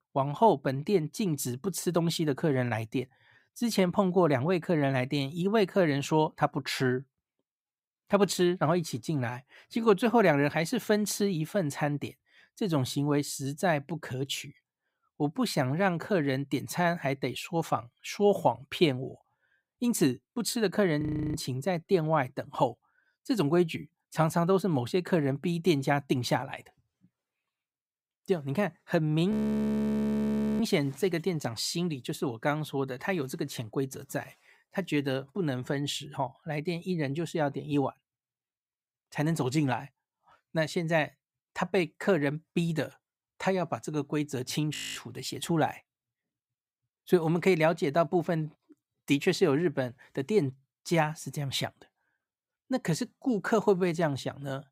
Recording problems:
audio freezing; at 21 s, at 29 s for 1.5 s and at 45 s

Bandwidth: 15.5 kHz